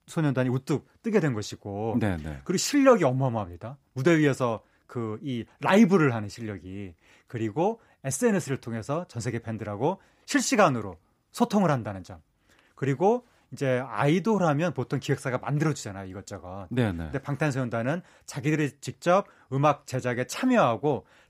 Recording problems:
none

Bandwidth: 15 kHz